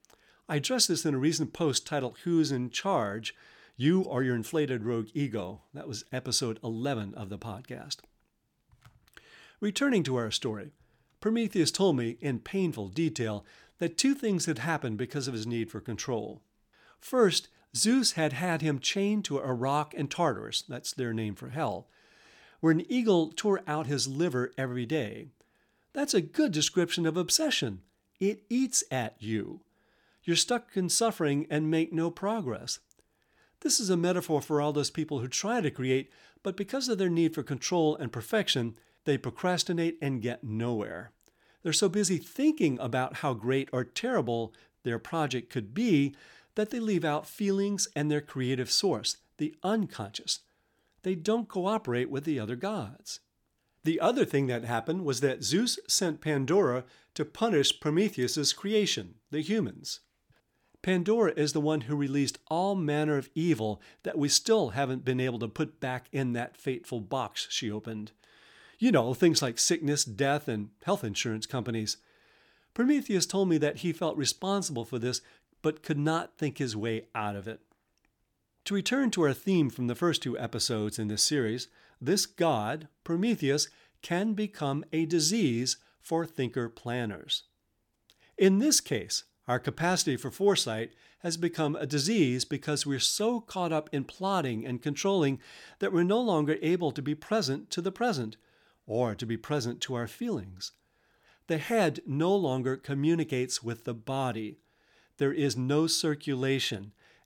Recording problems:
none

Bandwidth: 18 kHz